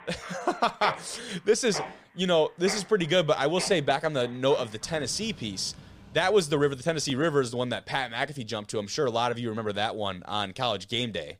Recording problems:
machinery noise; noticeable; throughout; 15 dB below the speech

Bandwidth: 15 kHz